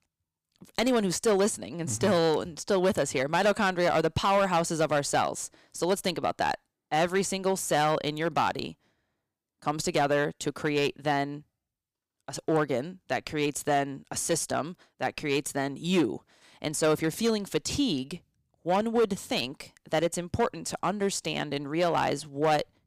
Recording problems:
distortion; slight; 4% of the sound clipped

